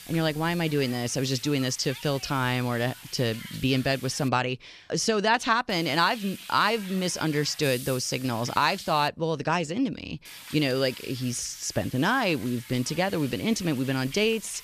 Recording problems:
hiss; noticeable; until 4.5 s, from 5.5 to 9 s and from 10 s on; 15 dB below the speech

